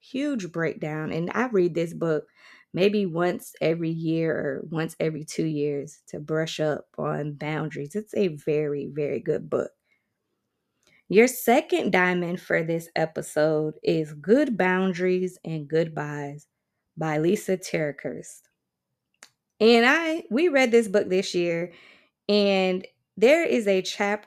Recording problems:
none

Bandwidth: 14.5 kHz